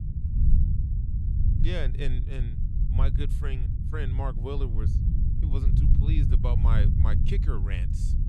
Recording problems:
low rumble; loud; throughout; 3 dB below the speech

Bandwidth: 15 kHz